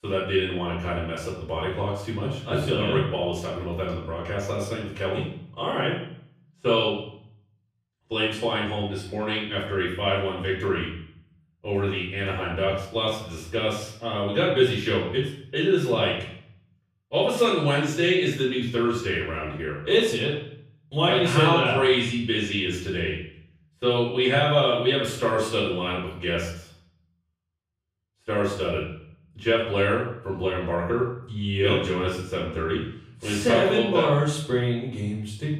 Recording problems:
off-mic speech; far
room echo; noticeable; dies away in 0.6 s

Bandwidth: 15.5 kHz